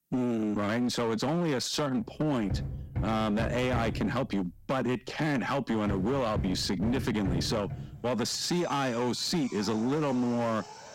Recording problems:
distortion; slight; 20% of the sound clipped
machinery noise; loud; from 2.5 s on; 8 dB below the speech

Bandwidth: 16 kHz